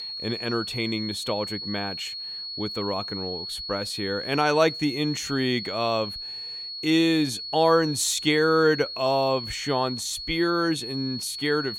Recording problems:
high-pitched whine; loud; throughout; 4.5 kHz, 7 dB below the speech

